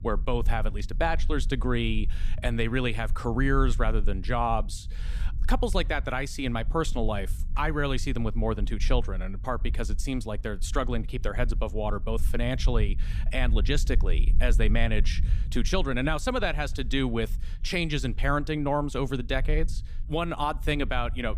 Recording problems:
low rumble; faint; throughout; 20 dB below the speech

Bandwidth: 15 kHz